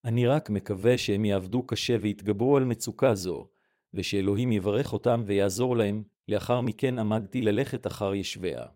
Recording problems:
none

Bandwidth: 16 kHz